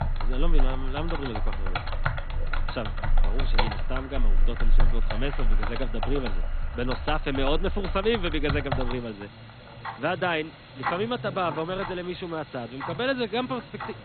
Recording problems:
garbled, watery; badly; nothing above 4 kHz
household noises; loud; throughout; 1 dB below the speech

